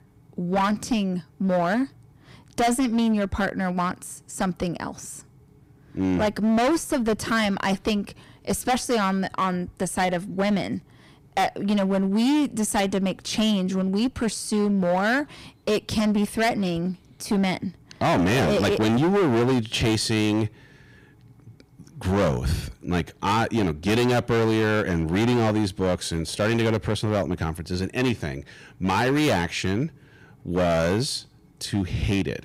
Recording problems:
distortion; heavy; 15% of the sound clipped

